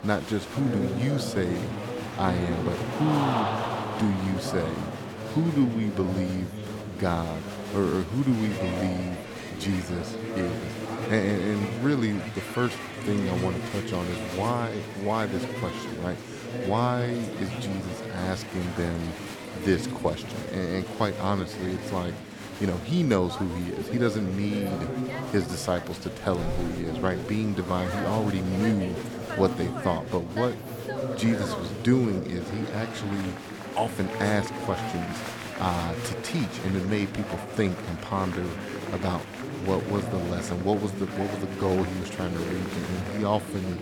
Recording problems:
murmuring crowd; loud; throughout; 5 dB below the speech

